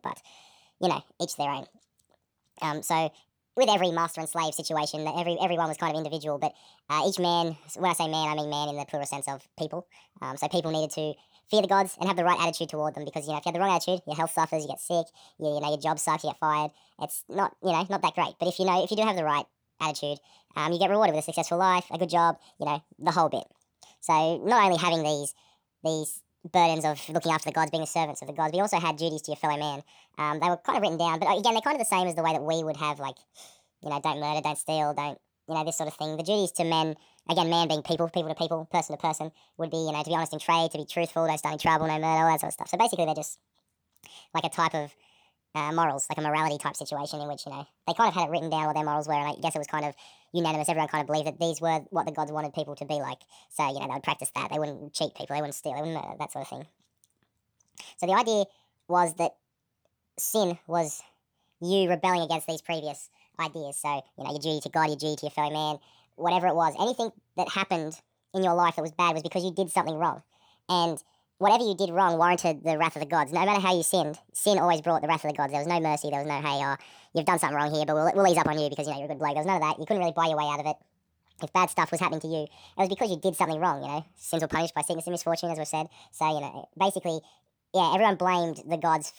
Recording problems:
wrong speed and pitch; too fast and too high; 1.6 times normal speed

